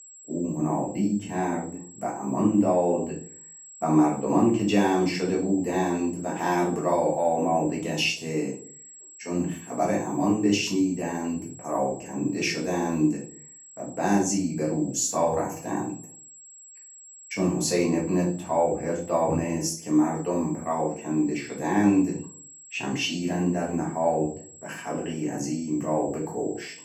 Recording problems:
off-mic speech; far
room echo; slight; dies away in 0.4 s
high-pitched whine; noticeable; throughout; 7.5 kHz, 20 dB below the speech

